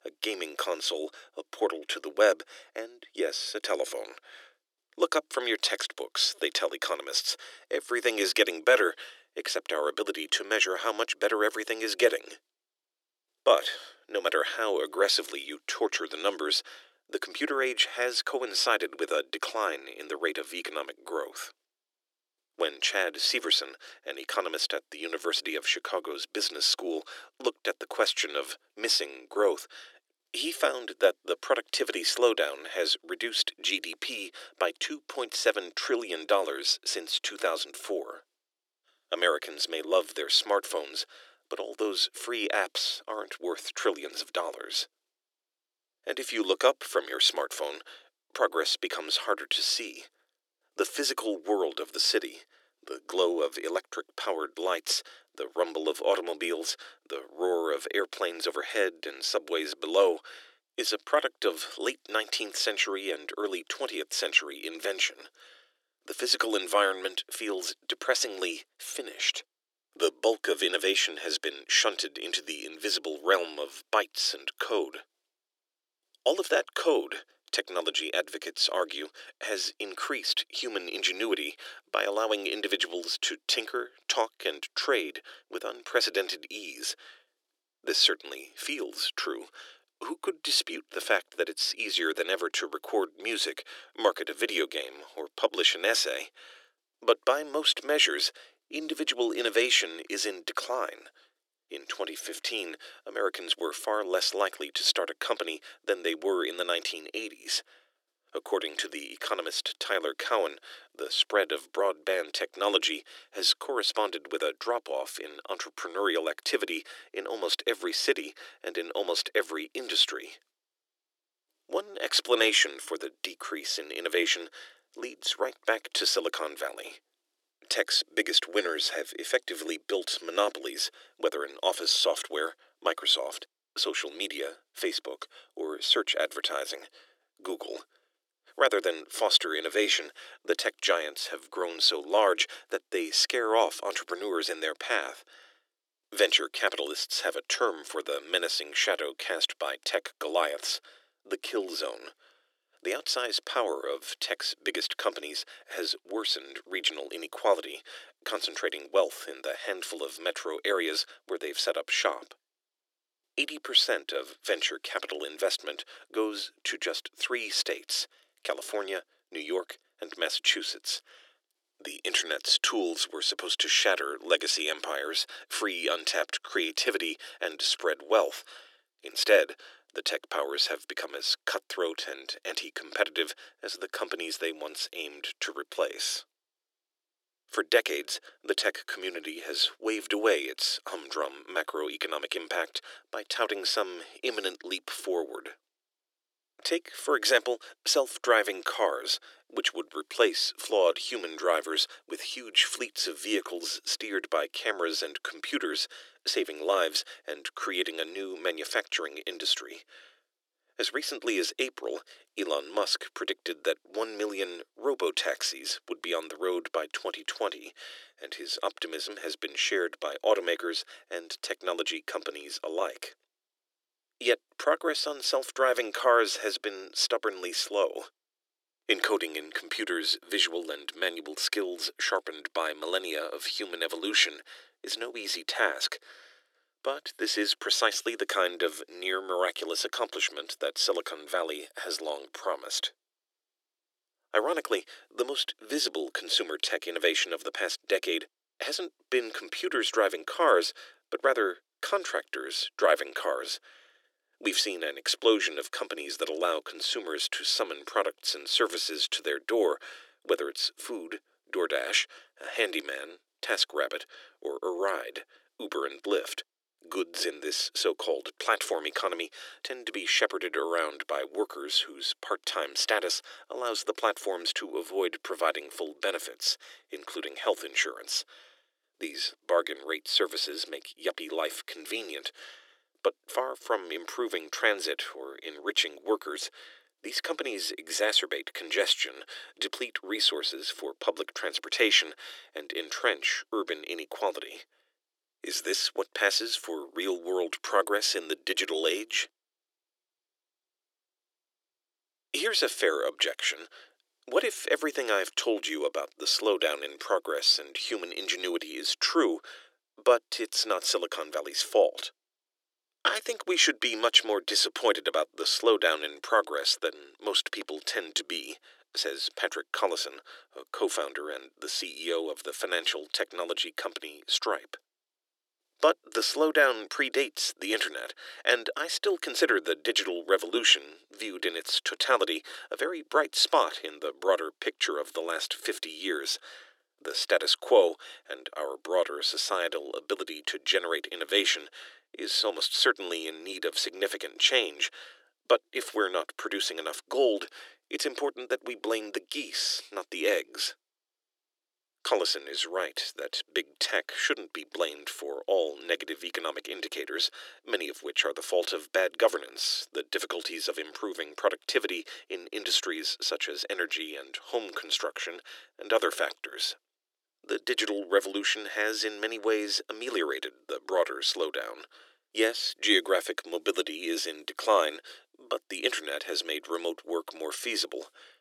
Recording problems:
thin; very; fading below 350 Hz

